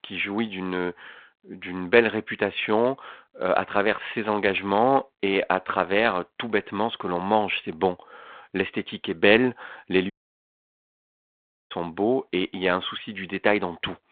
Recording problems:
phone-call audio; nothing above 3.5 kHz
audio cutting out; at 10 s for 1.5 s

